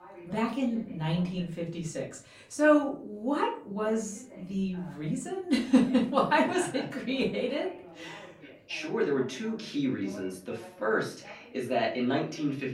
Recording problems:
off-mic speech; far
room echo; slight; dies away in 0.3 s
voice in the background; faint; throughout; 20 dB below the speech

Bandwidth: 16 kHz